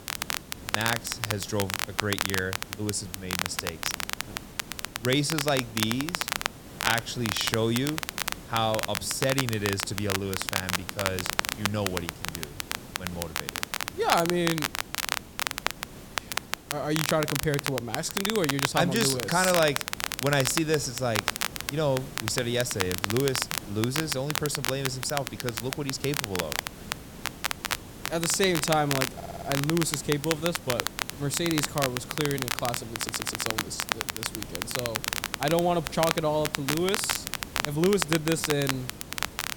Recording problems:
crackle, like an old record; loud; 2 dB below the speech
hiss; noticeable; throughout; 15 dB below the speech
audio stuttering; at 29 s and at 33 s

